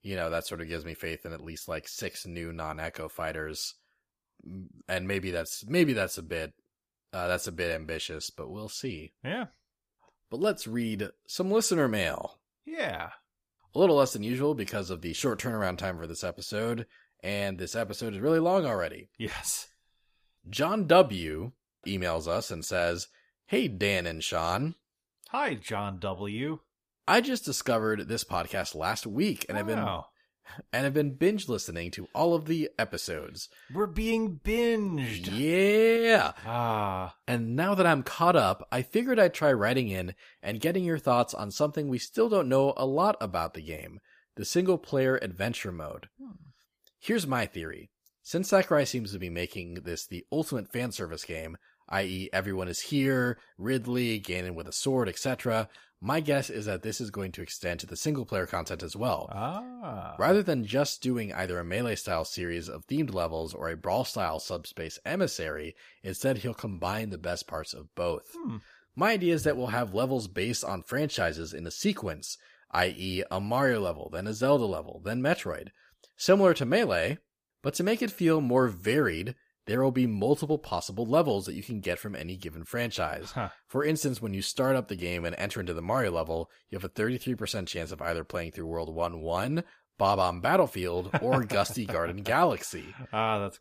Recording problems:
none

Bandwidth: 15 kHz